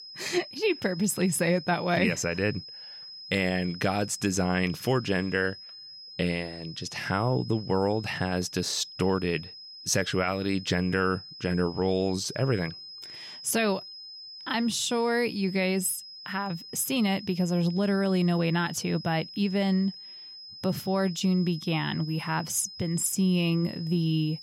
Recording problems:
high-pitched whine; noticeable; throughout; 5 kHz, 15 dB below the speech

